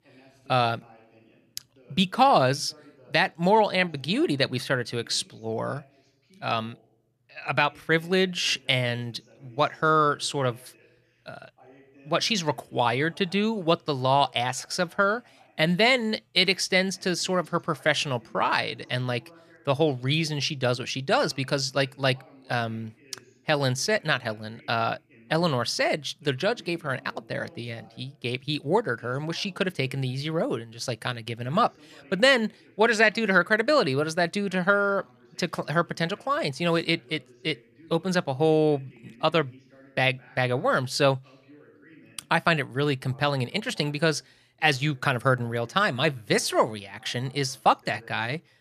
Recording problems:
voice in the background; faint; throughout; 30 dB below the speech

